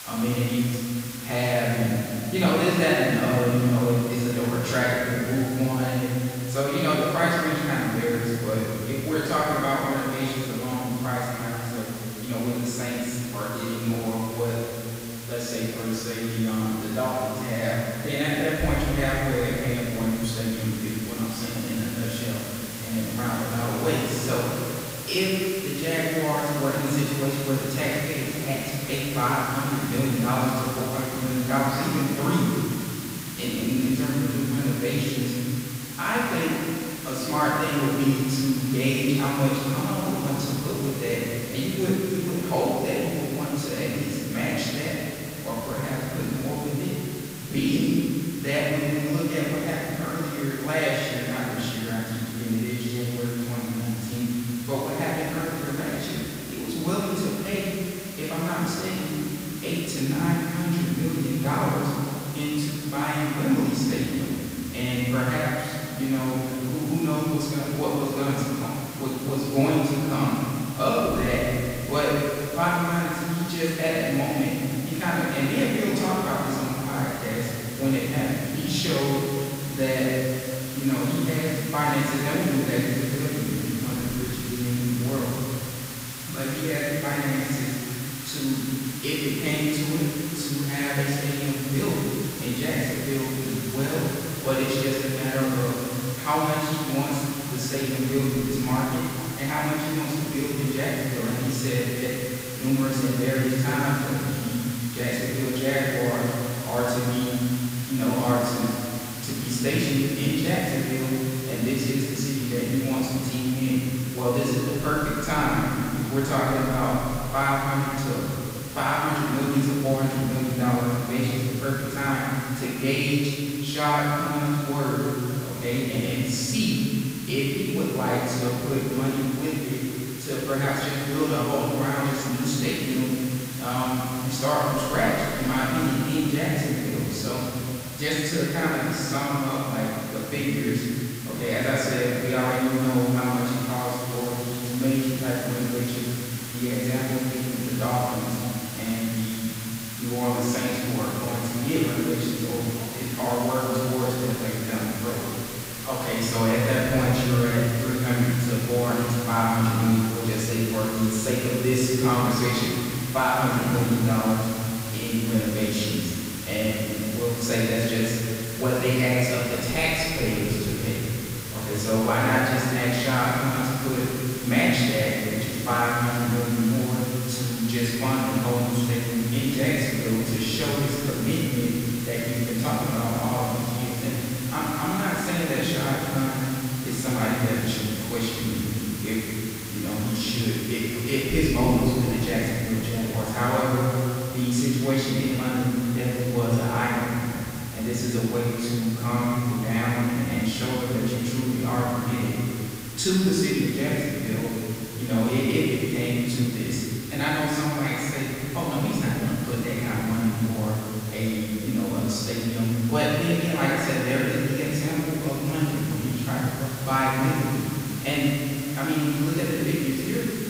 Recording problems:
room echo; strong; dies away in 2.6 s
off-mic speech; far
hiss; very faint; throughout; 10 dB below the speech

